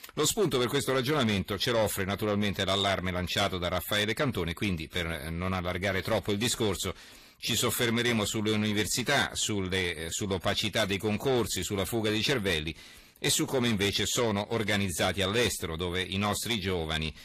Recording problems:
distortion; slight; 10 dB below the speech
garbled, watery; slightly; nothing above 14.5 kHz

